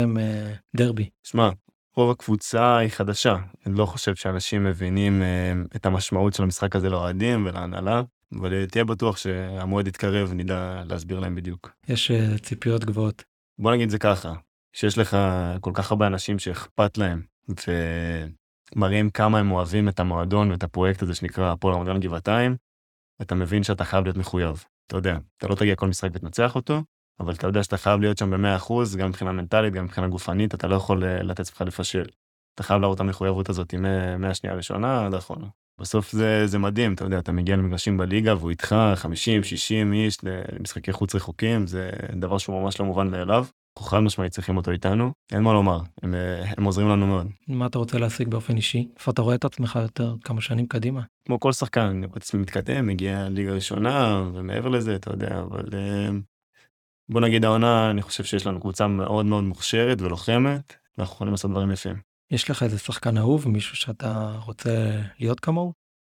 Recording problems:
abrupt cut into speech; at the start

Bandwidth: 18.5 kHz